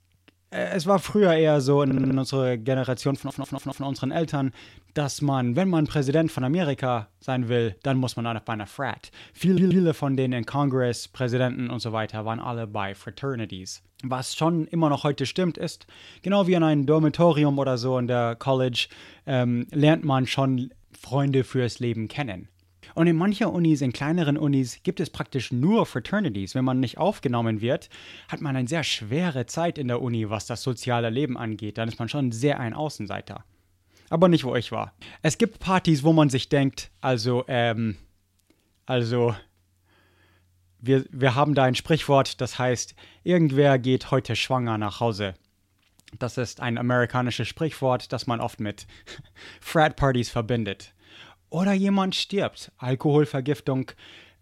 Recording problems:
audio stuttering; at 2 s, at 3 s and at 9.5 s

